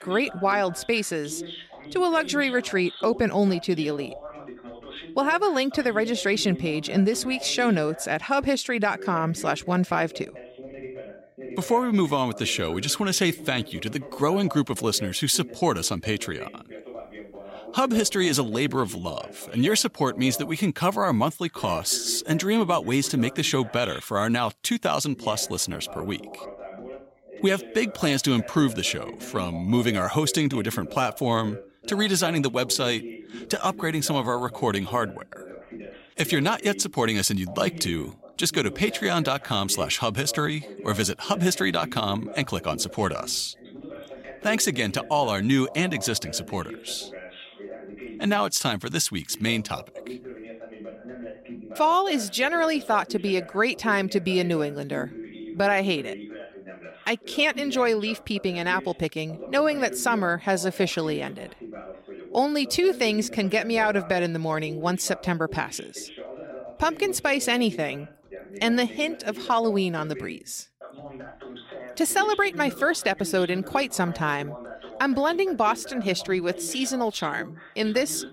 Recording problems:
voice in the background; noticeable; throughout; 15 dB below the speech

